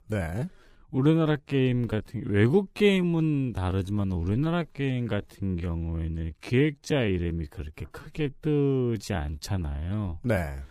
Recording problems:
wrong speed, natural pitch; too slow; 0.6 times normal speed

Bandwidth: 15 kHz